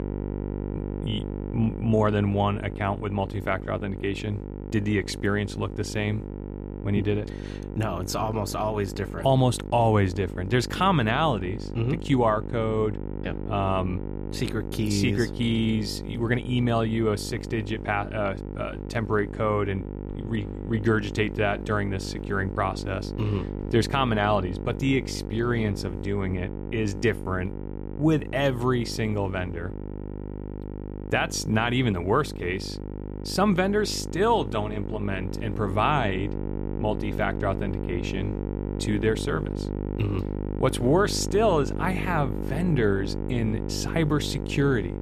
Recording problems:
electrical hum; noticeable; throughout; 50 Hz, 10 dB below the speech

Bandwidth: 14.5 kHz